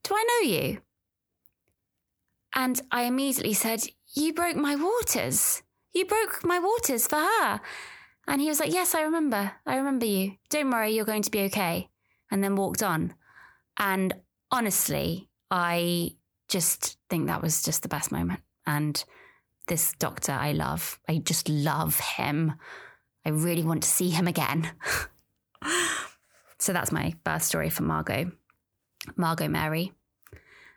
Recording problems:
none

